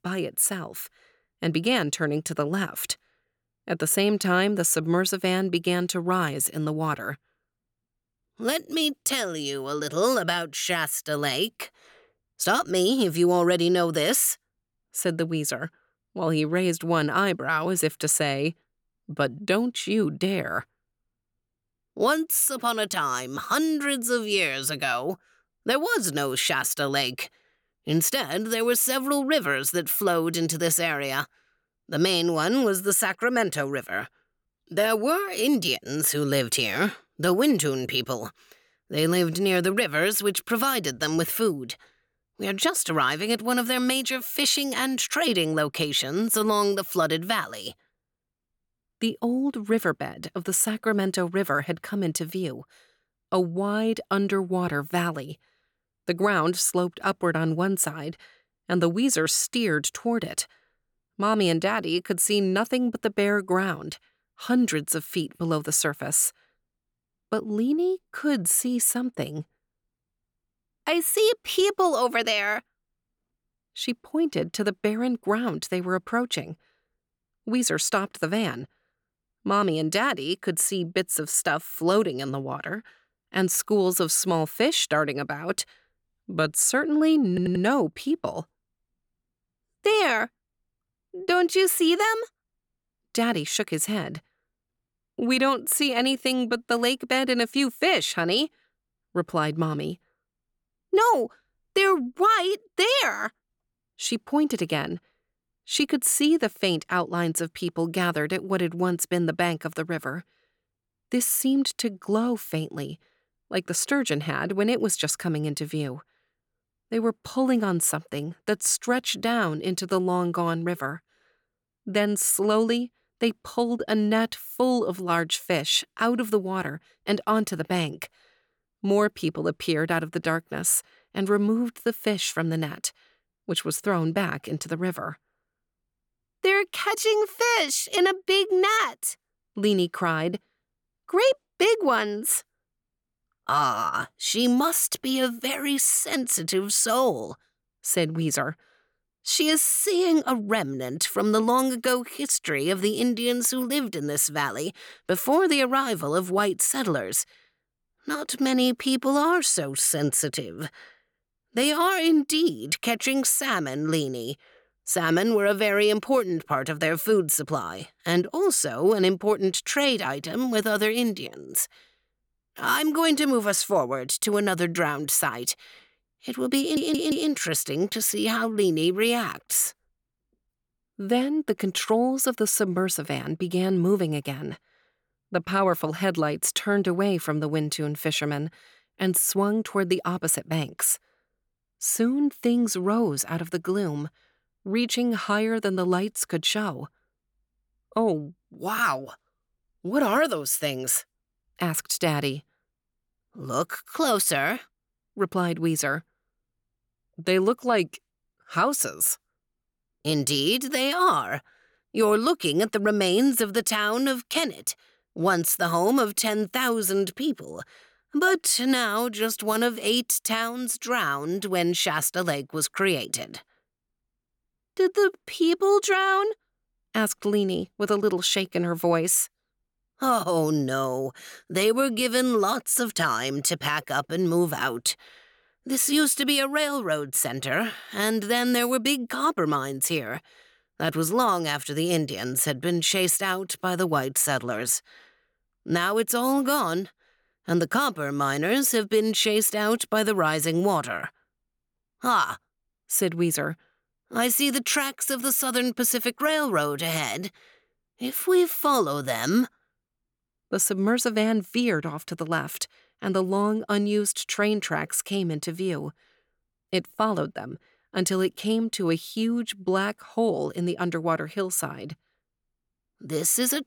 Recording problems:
audio stuttering; at 1:27 and at 2:57

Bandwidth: 18 kHz